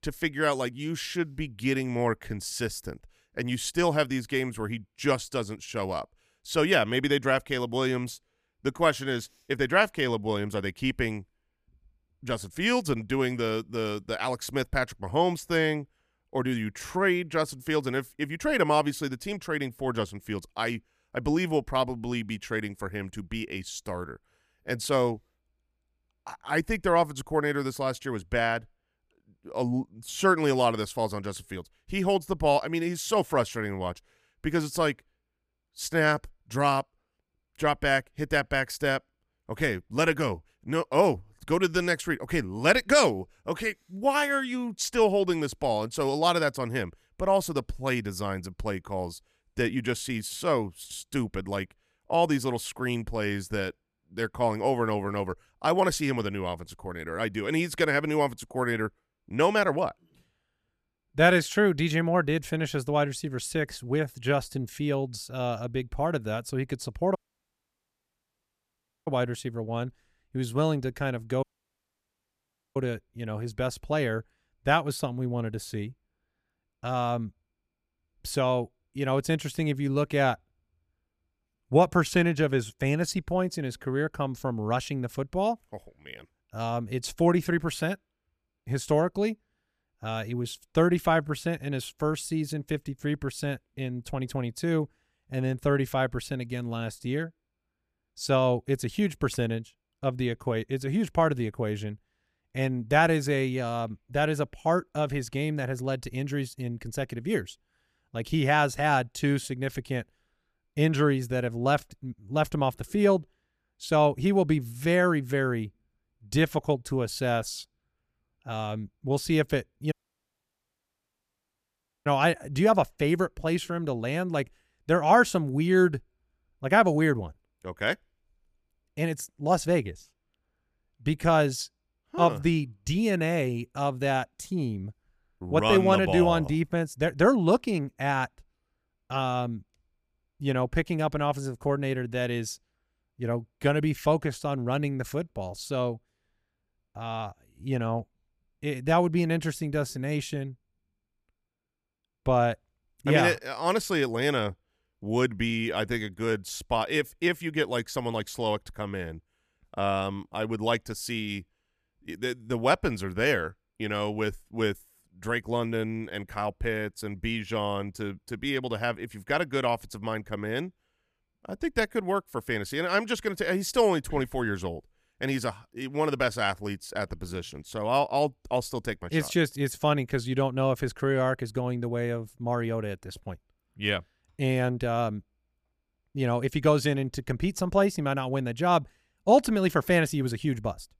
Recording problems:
audio cutting out; at 1:07 for 2 s, at 1:11 for 1.5 s and at 2:00 for 2 s

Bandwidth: 14.5 kHz